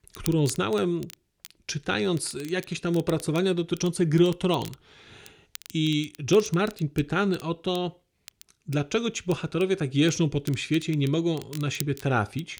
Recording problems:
crackle, like an old record; faint; 20 dB below the speech

